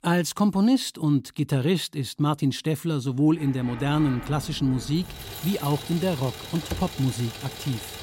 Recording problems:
traffic noise; noticeable; from 3.5 s on; 15 dB below the speech
jangling keys; faint; at 5 s; peak 15 dB below the speech
door banging; faint; at 6.5 s; peak 10 dB below the speech

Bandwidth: 16 kHz